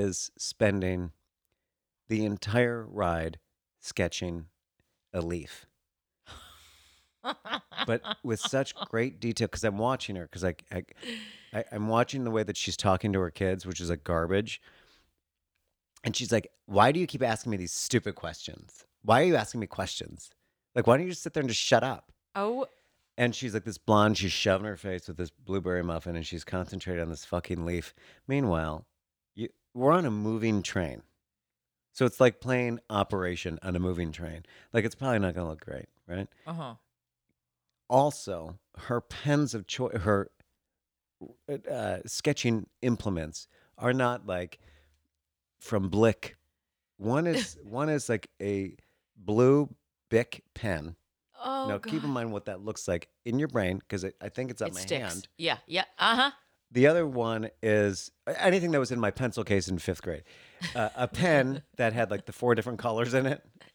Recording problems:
abrupt cut into speech; at the start

